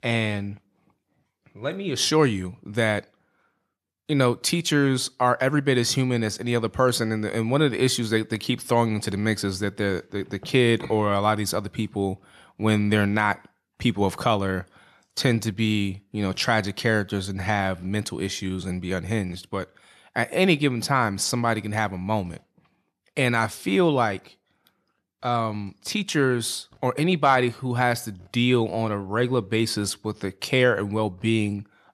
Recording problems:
none

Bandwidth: 13.5 kHz